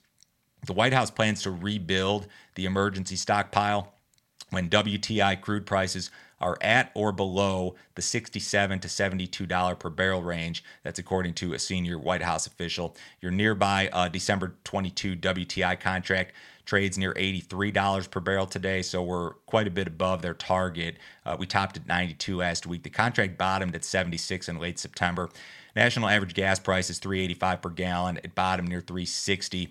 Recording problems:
none

